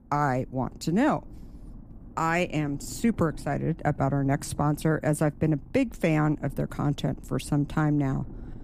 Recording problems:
low rumble; faint; throughout; 25 dB below the speech

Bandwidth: 15 kHz